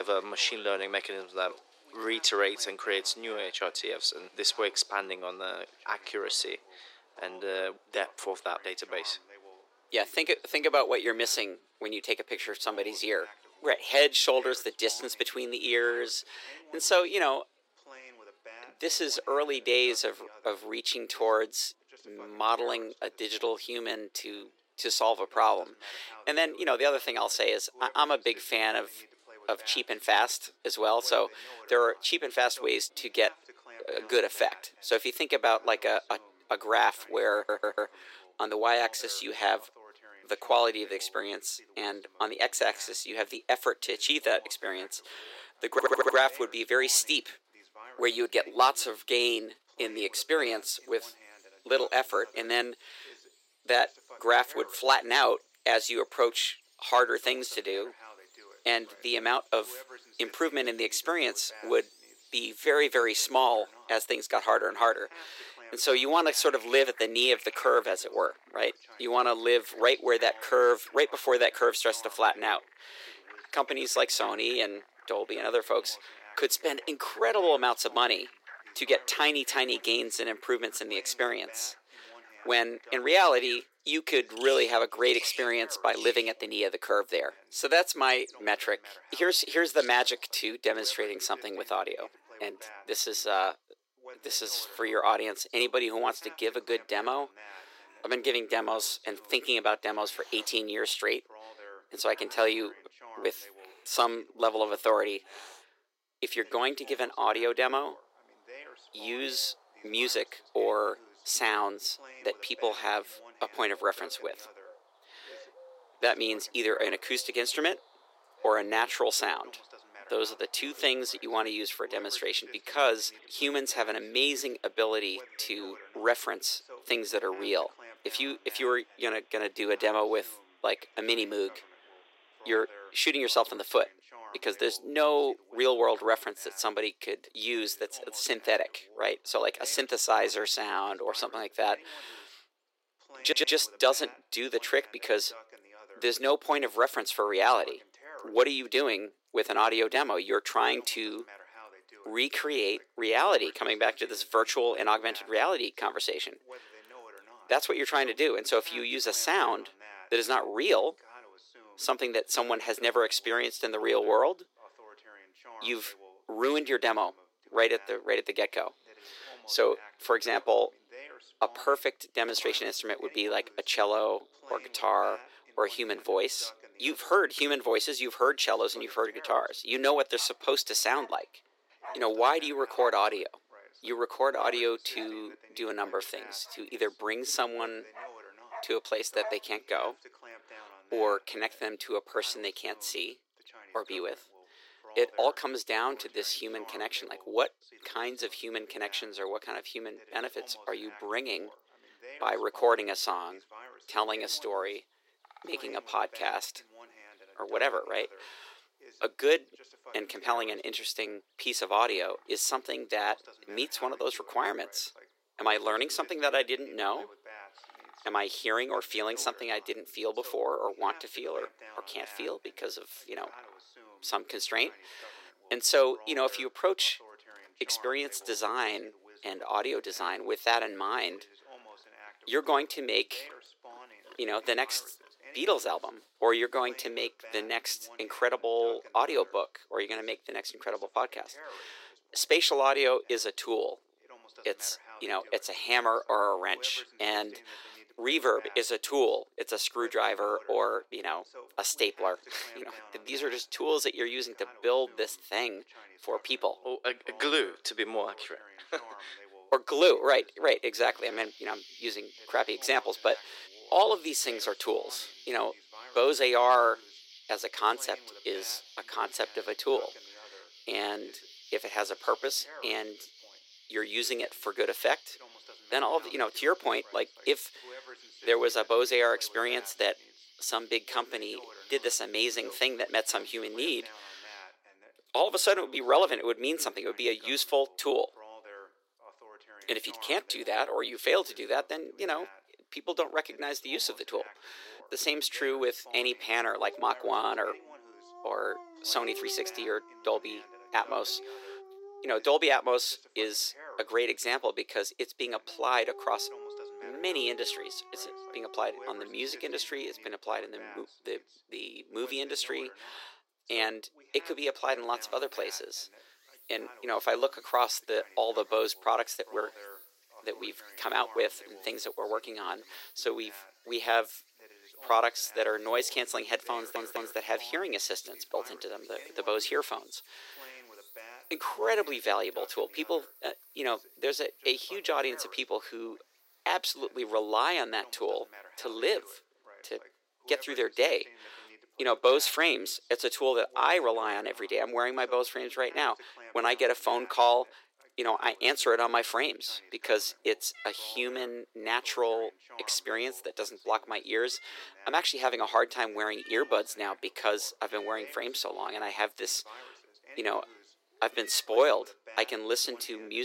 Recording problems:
thin; very; fading below 350 Hz
animal sounds; faint; throughout; 20 dB below the speech
voice in the background; faint; throughout; 25 dB below the speech
abrupt cut into speech; at the start and the end
audio stuttering; 4 times, first at 37 s

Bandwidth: 16 kHz